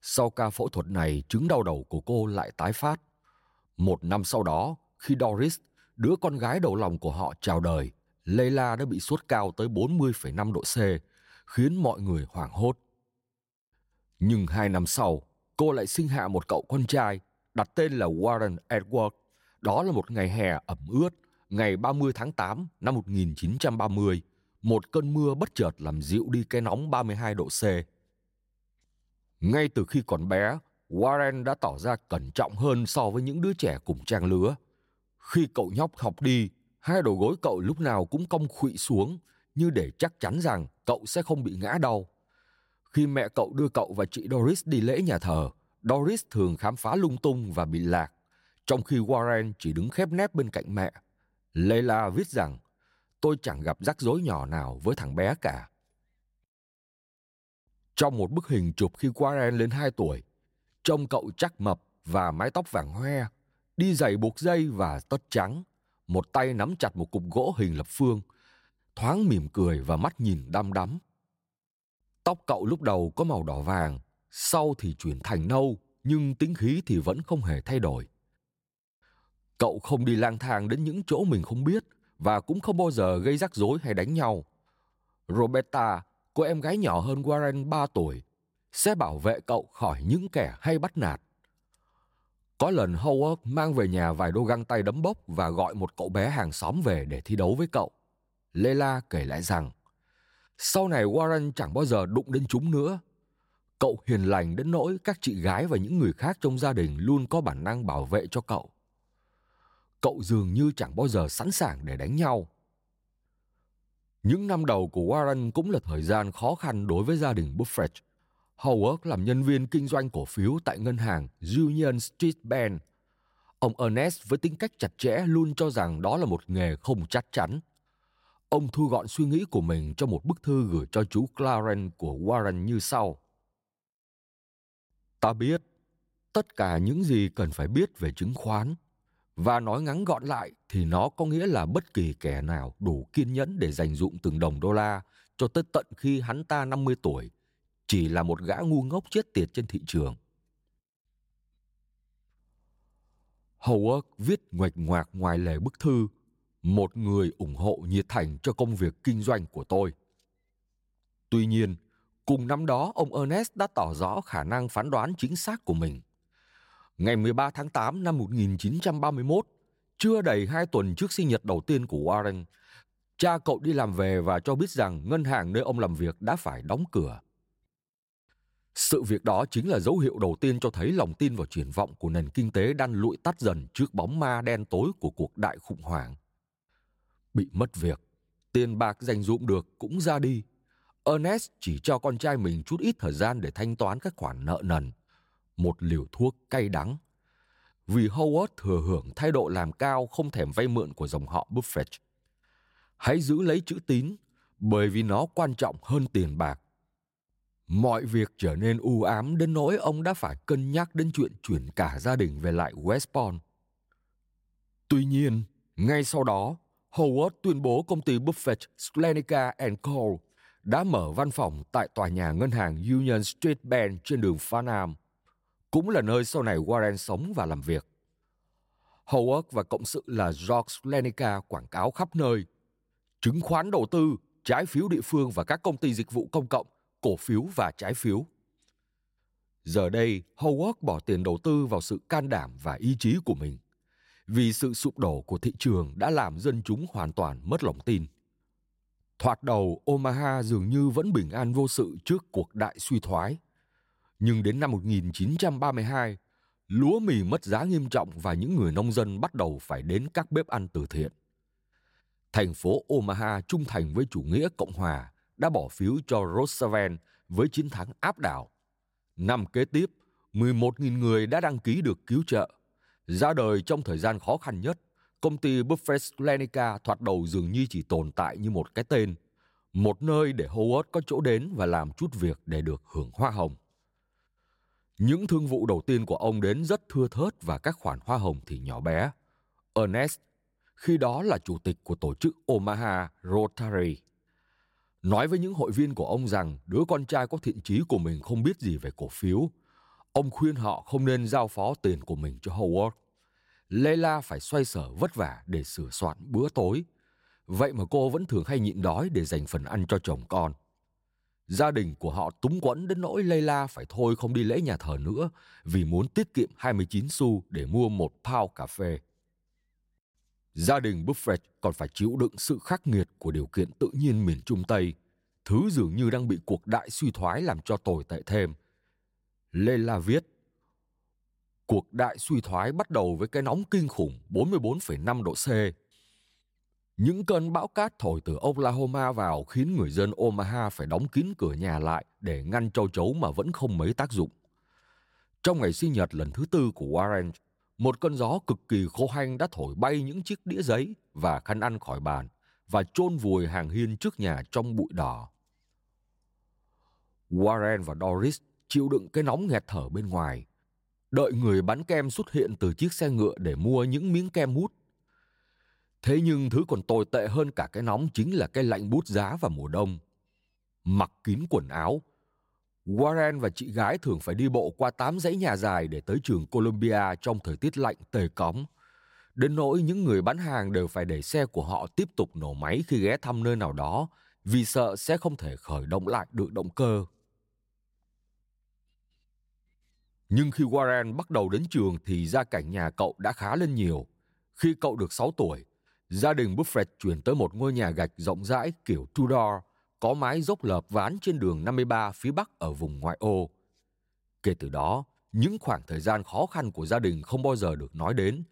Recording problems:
none

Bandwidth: 16 kHz